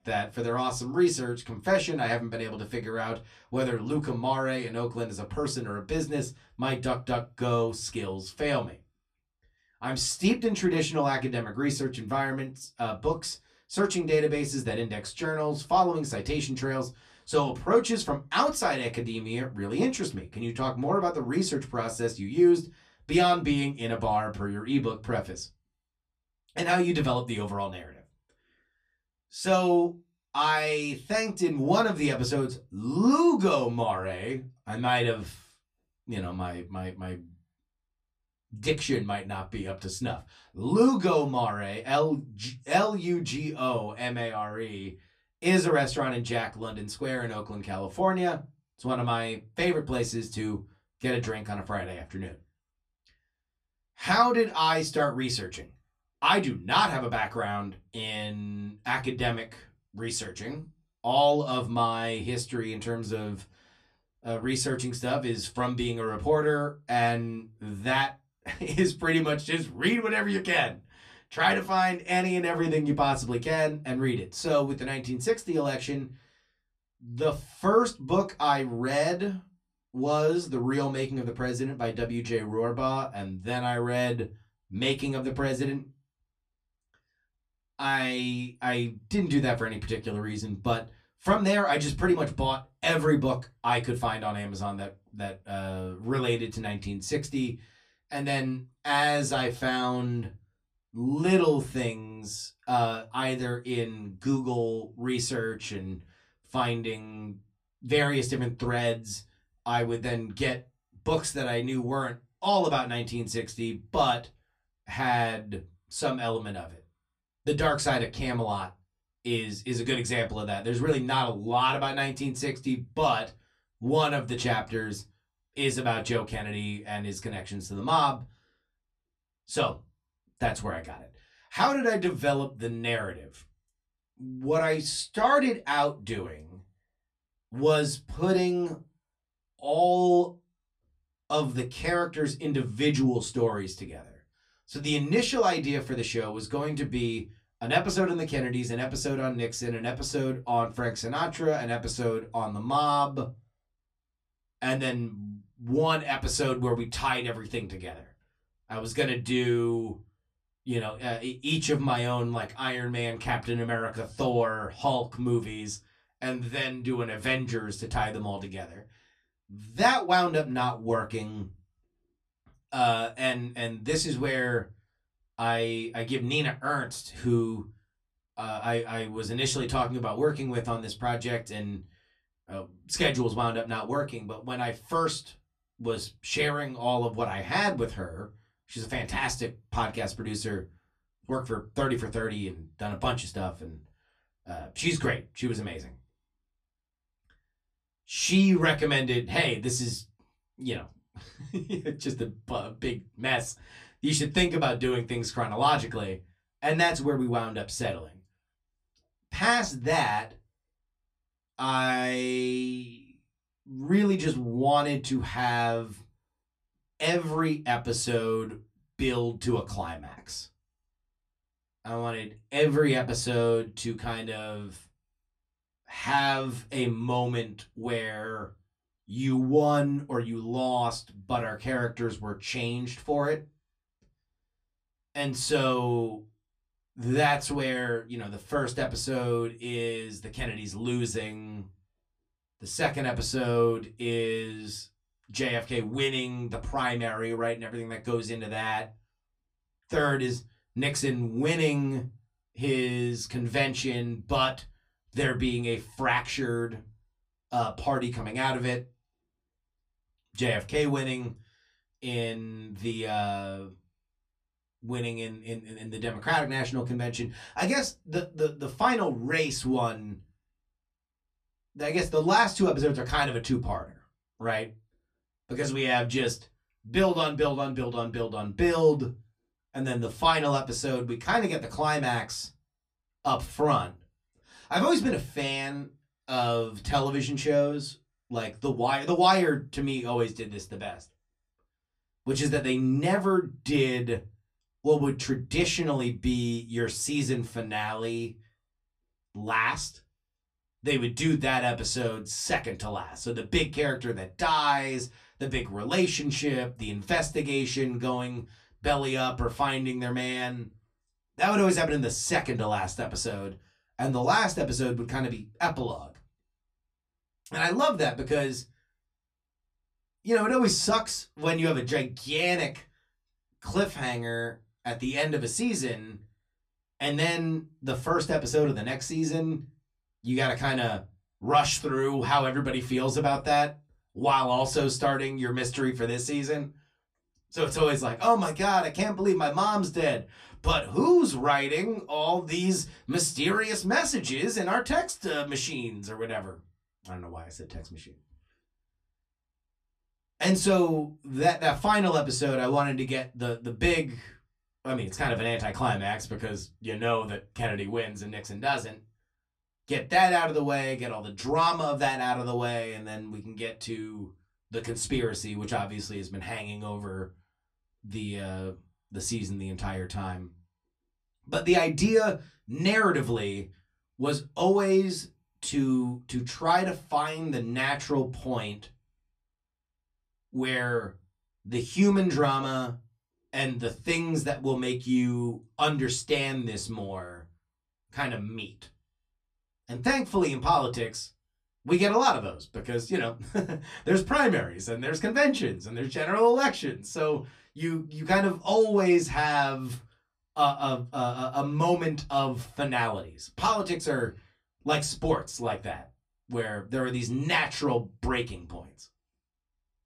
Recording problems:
off-mic speech; far
room echo; very slight; dies away in 0.2 s

